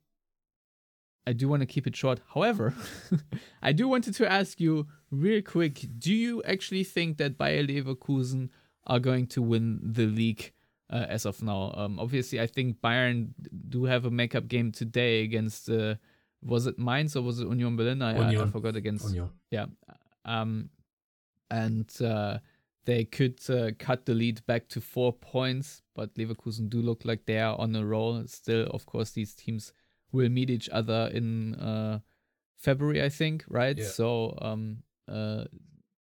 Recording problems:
none

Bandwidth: 19 kHz